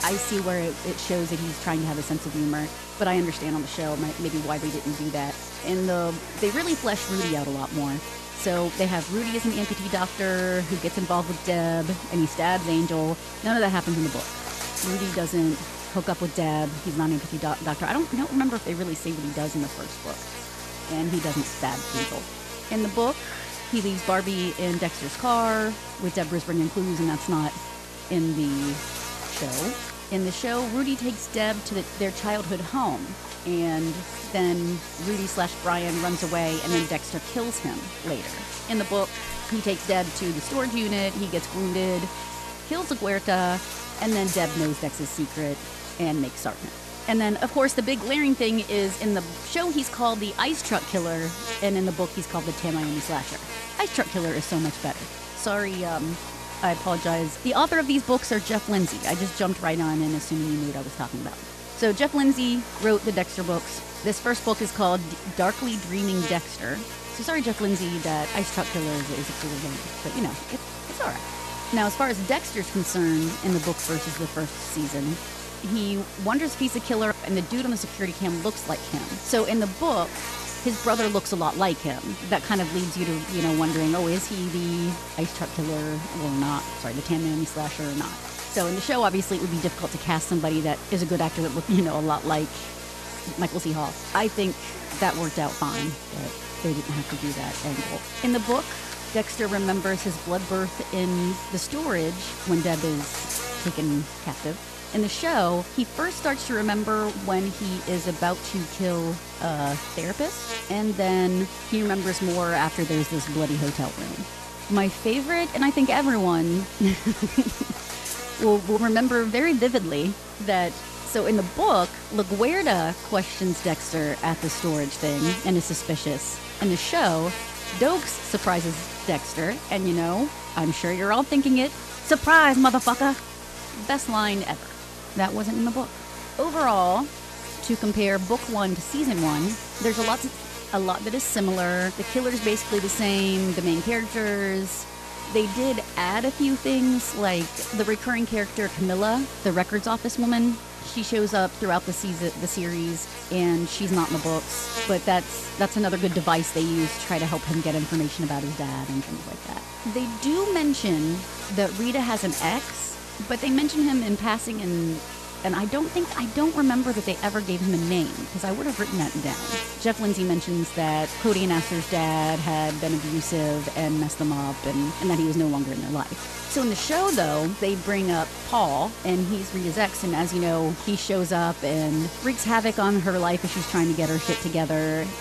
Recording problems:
electrical hum; loud; throughout; 60 Hz, 7 dB below the speech

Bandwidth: 13.5 kHz